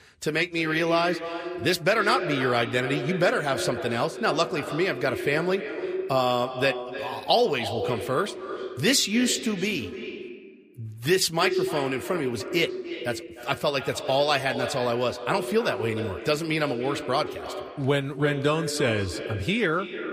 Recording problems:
echo of what is said; strong; throughout; 300 ms later, 8 dB below the speech

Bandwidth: 15 kHz